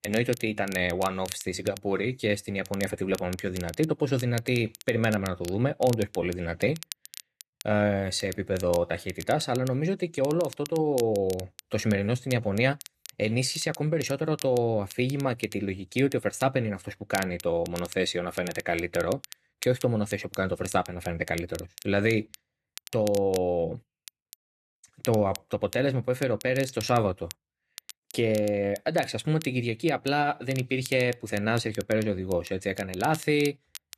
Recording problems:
crackle, like an old record; noticeable; 15 dB below the speech

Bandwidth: 13.5 kHz